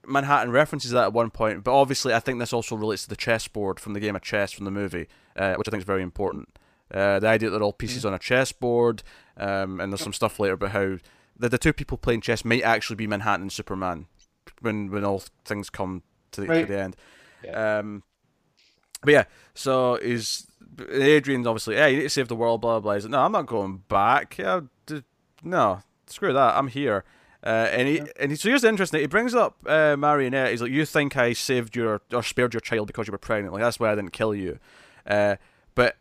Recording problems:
uneven, jittery; strongly; from 5 to 33 s

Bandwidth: 15 kHz